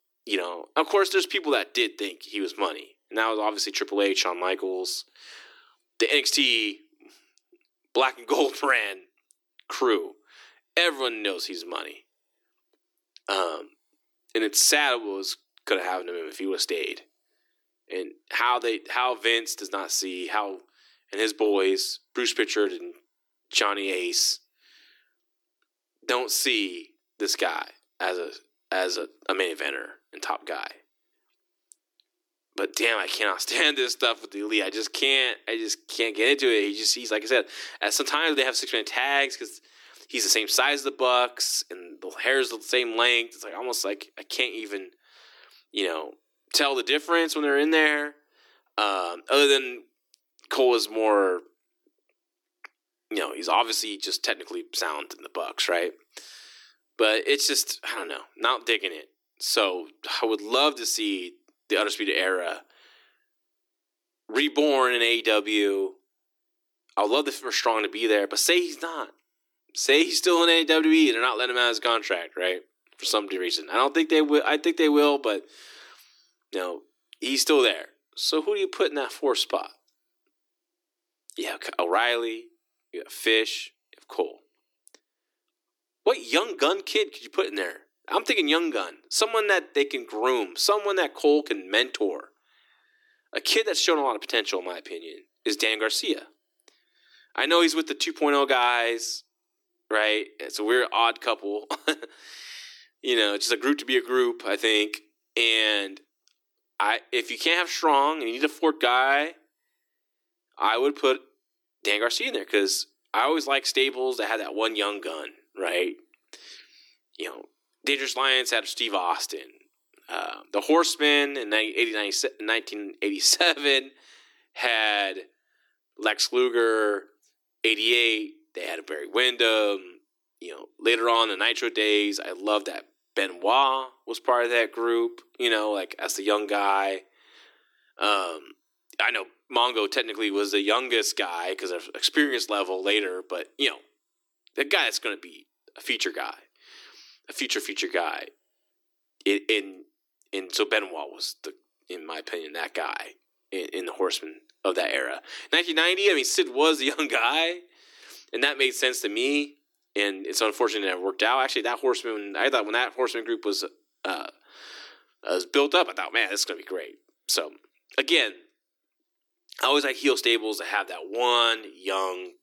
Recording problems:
thin; somewhat; fading below 300 Hz

